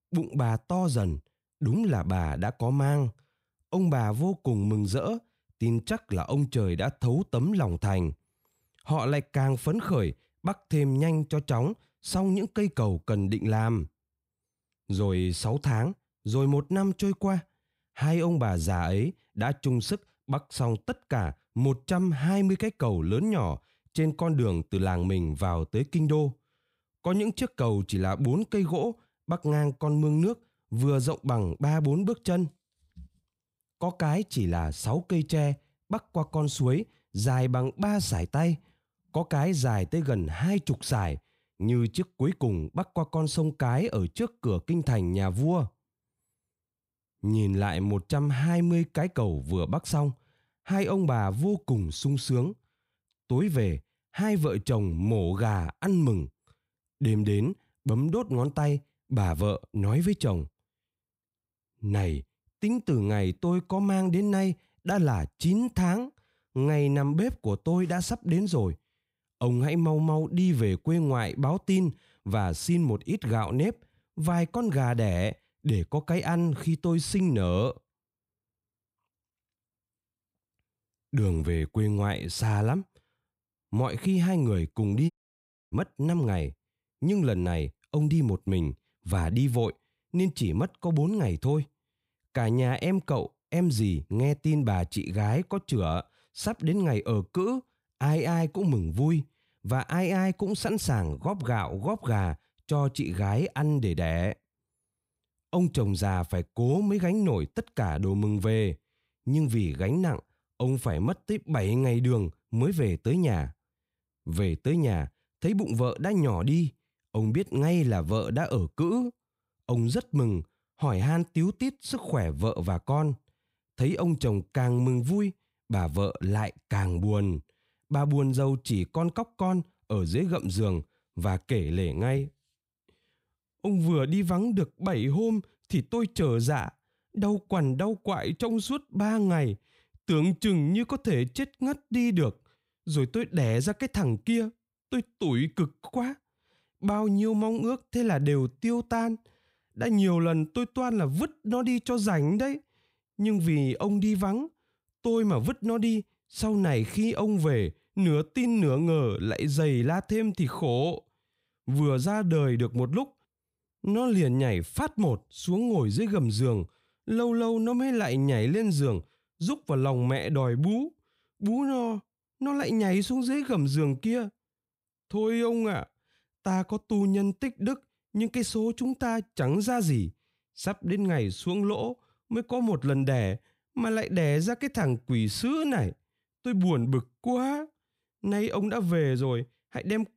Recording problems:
audio cutting out; at 1:25 for 0.5 s

